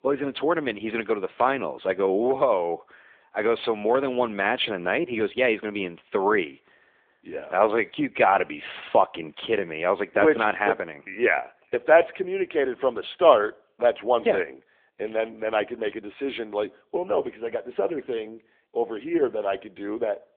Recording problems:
phone-call audio

